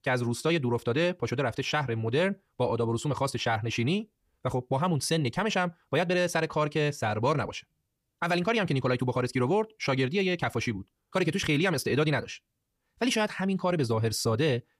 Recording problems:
wrong speed, natural pitch; too fast; 1.6 times normal speed

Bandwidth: 15 kHz